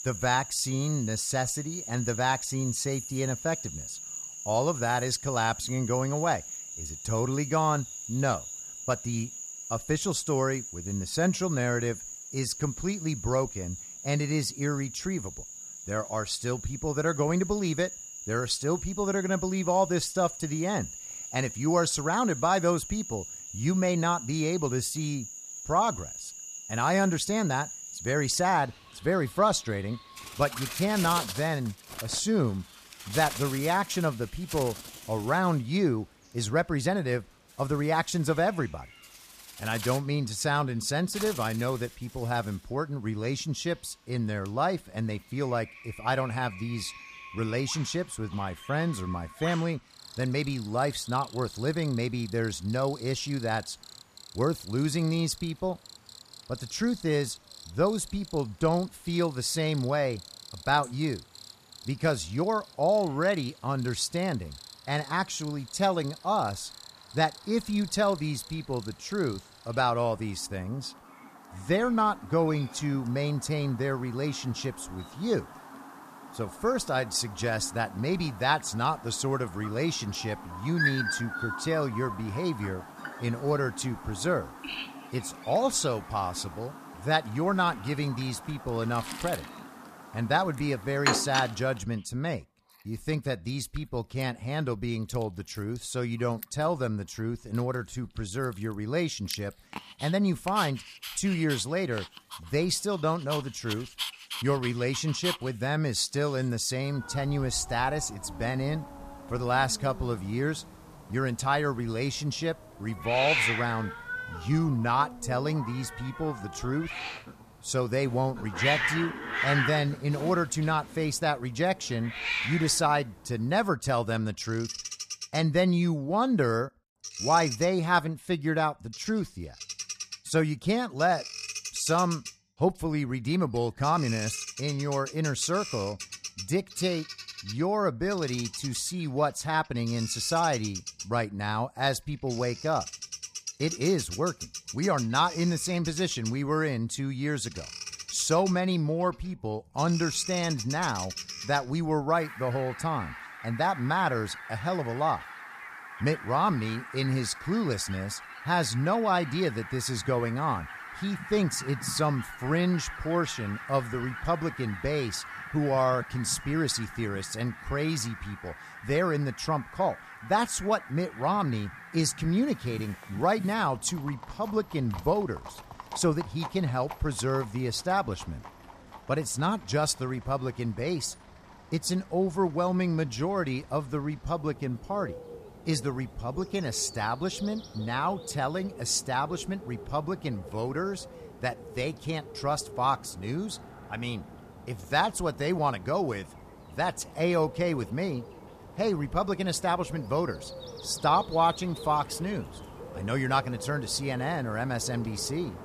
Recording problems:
animal sounds; loud; throughout; 10 dB below the speech

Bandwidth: 14.5 kHz